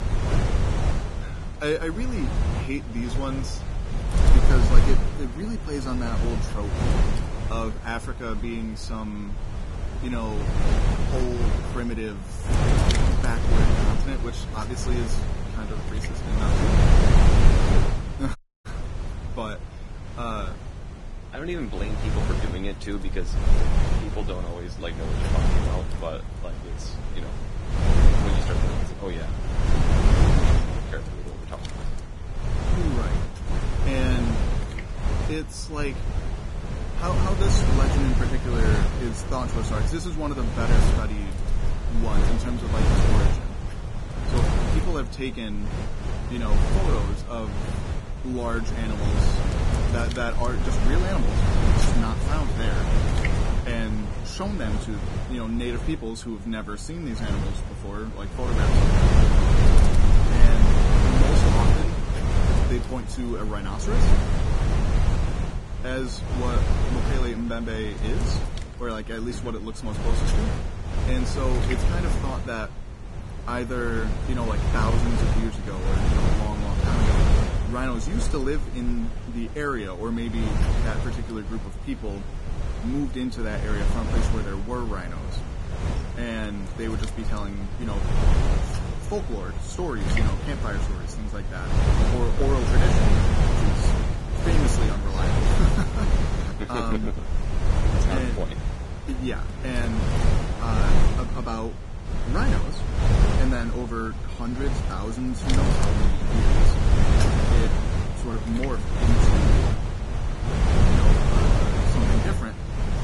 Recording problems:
garbled, watery; badly; nothing above 10.5 kHz
wind noise on the microphone; heavy; 1 dB above the speech
audio cutting out; at 18 s

